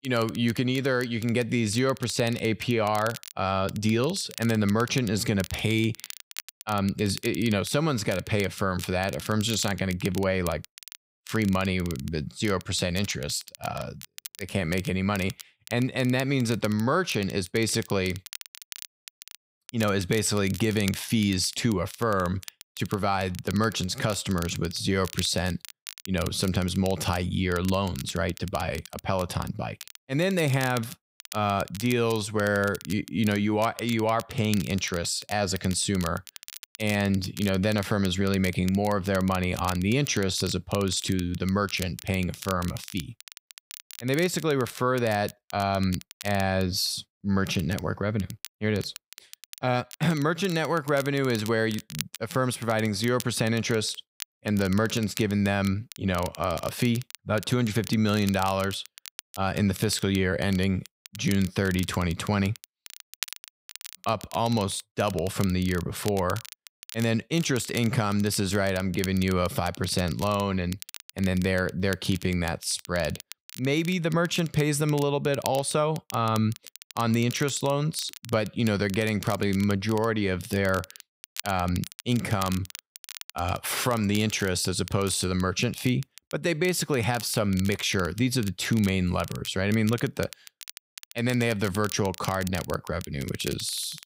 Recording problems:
crackle, like an old record; noticeable; 15 dB below the speech

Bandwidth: 15.5 kHz